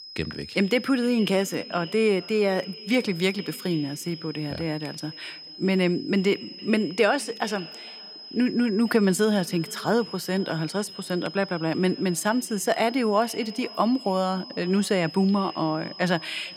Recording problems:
echo of what is said; faint; throughout; 460 ms later, 20 dB below the speech
high-pitched whine; noticeable; throughout; 5 kHz, 15 dB below the speech

